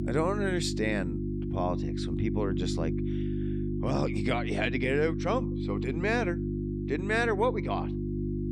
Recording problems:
electrical hum; loud; throughout; 50 Hz, 7 dB below the speech

